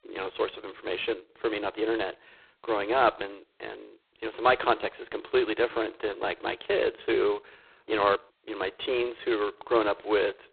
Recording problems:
phone-call audio; poor line; nothing above 4 kHz

